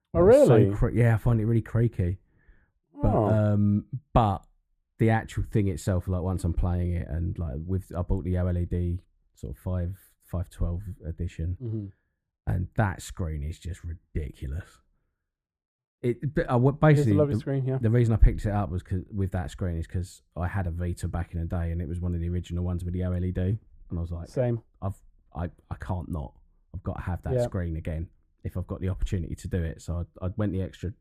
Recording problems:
muffled; very; fading above 1.5 kHz

